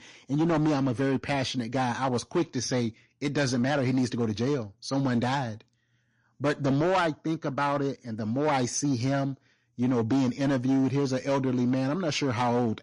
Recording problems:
distortion; slight; 10% of the sound clipped
garbled, watery; slightly; nothing above 10.5 kHz

